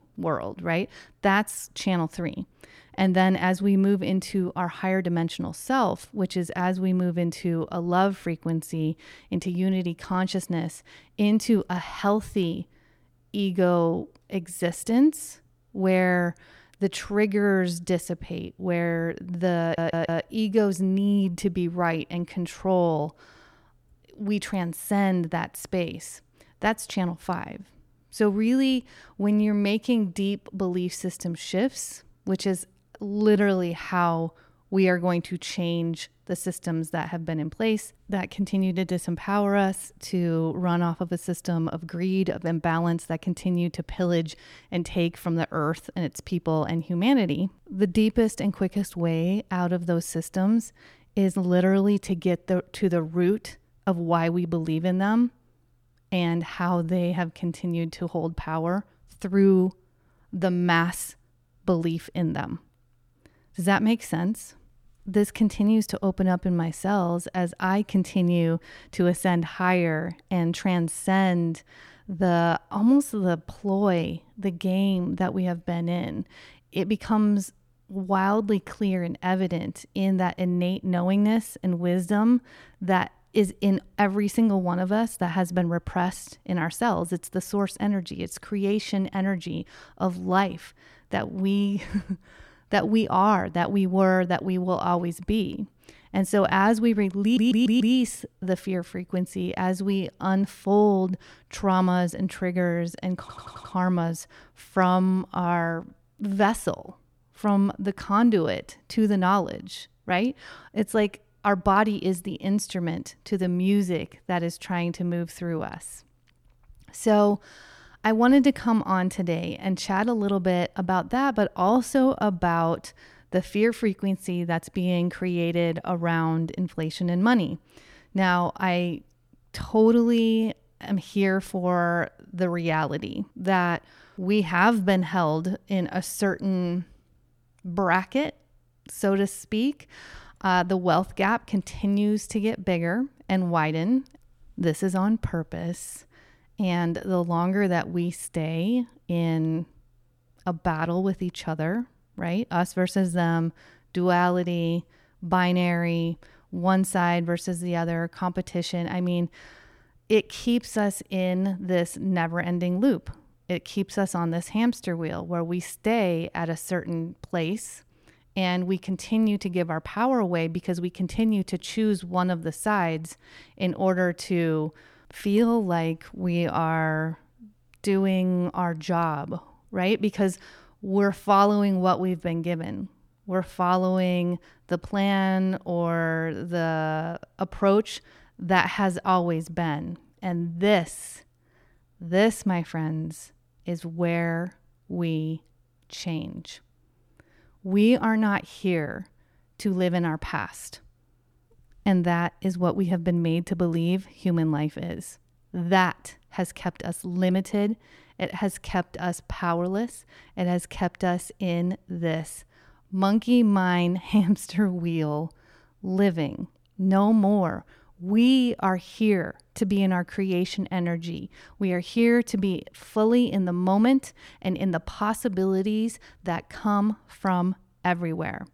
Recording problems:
audio stuttering; at 20 s, at 1:37 and at 1:43

